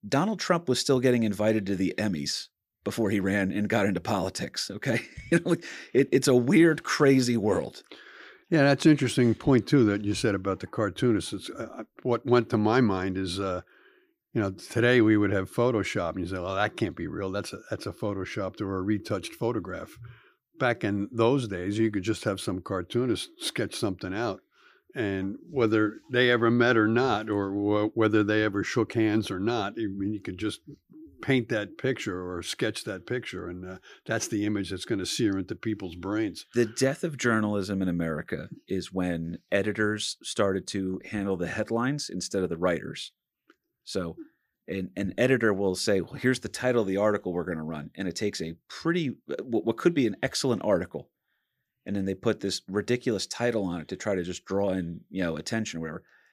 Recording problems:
none

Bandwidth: 15 kHz